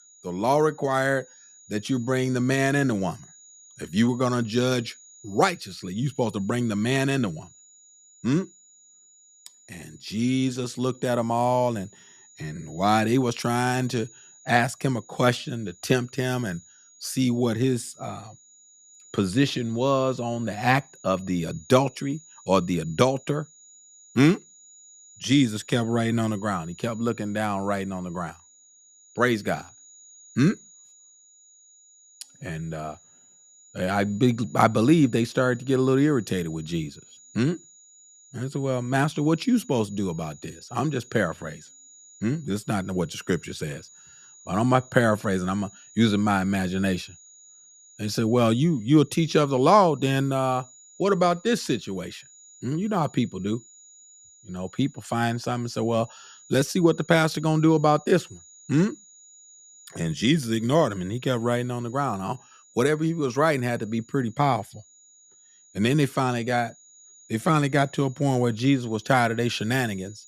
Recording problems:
high-pitched whine; faint; throughout; 7 kHz, 25 dB below the speech

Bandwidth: 14.5 kHz